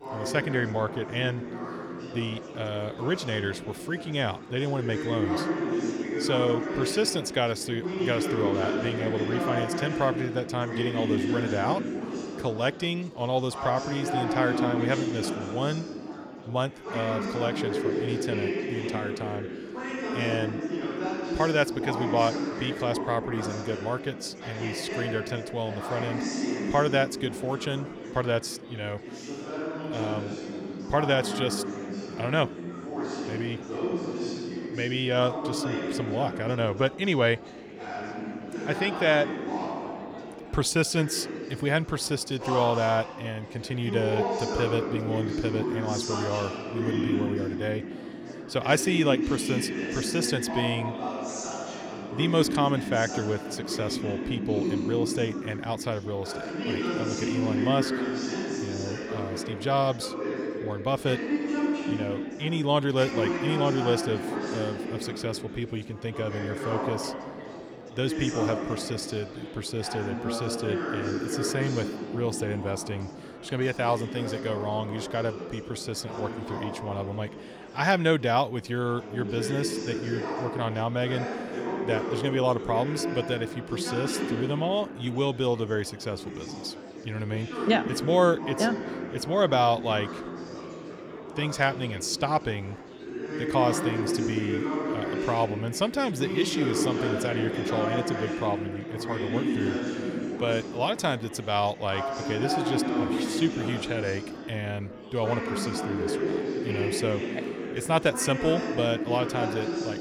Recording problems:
chatter from many people; loud; throughout; 3 dB below the speech

